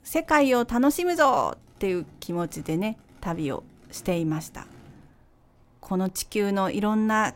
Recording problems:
traffic noise; faint; throughout; 30 dB below the speech

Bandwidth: 16 kHz